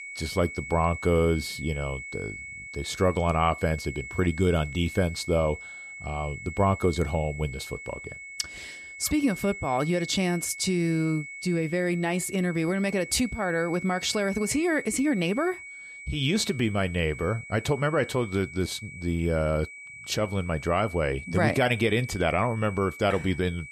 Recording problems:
high-pitched whine; noticeable; throughout; 2 kHz, 10 dB below the speech

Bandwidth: 14 kHz